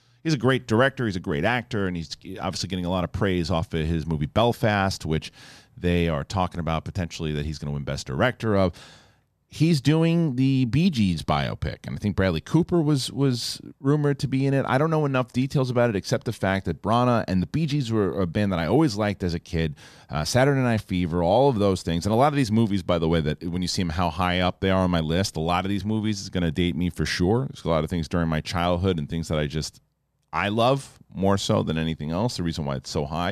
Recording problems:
abrupt cut into speech; at the end

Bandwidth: 14.5 kHz